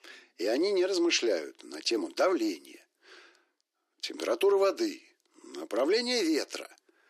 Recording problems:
thin; very; fading below 300 Hz

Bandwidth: 14 kHz